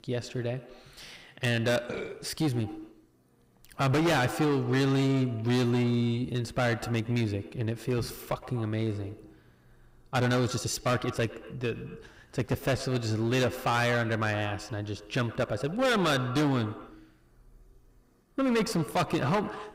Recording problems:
distortion; heavy; 11% of the sound clipped
echo of what is said; noticeable; throughout; 110 ms later, 15 dB below the speech
uneven, jittery; strongly; from 1 to 19 s

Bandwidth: 15.5 kHz